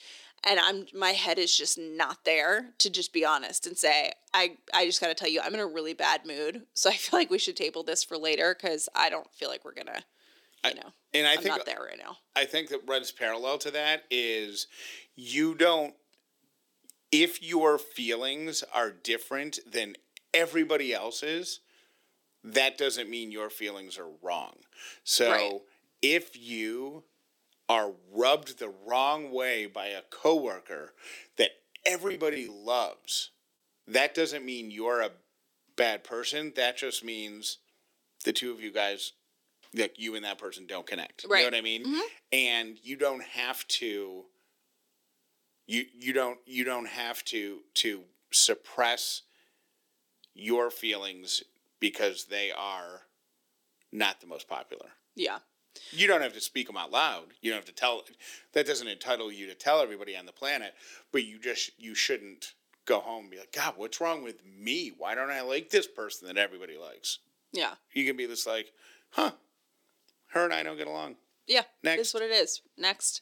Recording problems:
thin; somewhat; fading below 350 Hz
choppy; very; at 32 s; 6% of the speech affected

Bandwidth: 18 kHz